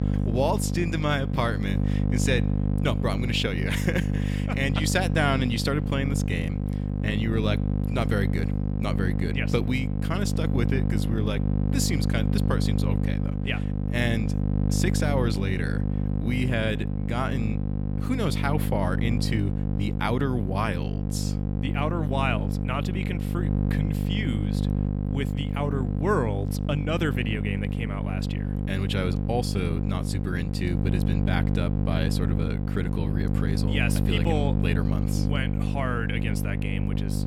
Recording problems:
electrical hum; loud; throughout; 50 Hz, 5 dB below the speech

